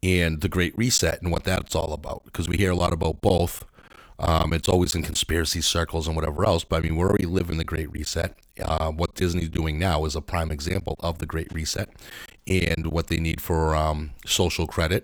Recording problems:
choppy; very; from 1 to 5 s, from 6.5 to 9.5 s and from 10 to 13 s; 10% of the speech affected

